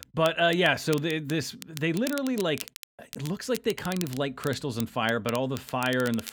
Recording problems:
crackle, like an old record; noticeable; 15 dB below the speech

